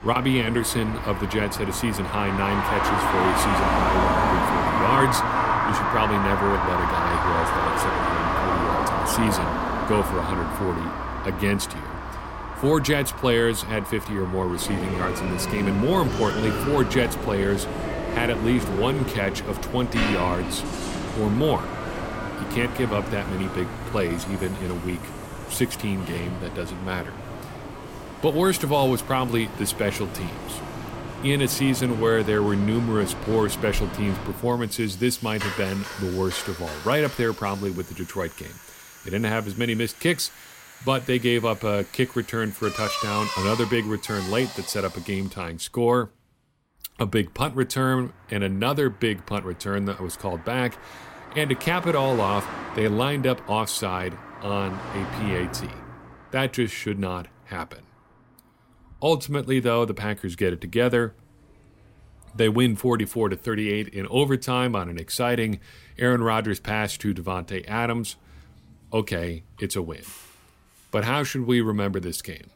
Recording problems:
traffic noise; loud; throughout; 3 dB below the speech

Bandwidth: 16 kHz